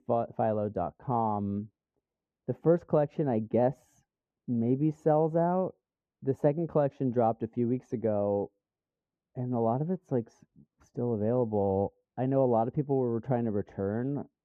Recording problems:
muffled; very; fading above 1.5 kHz

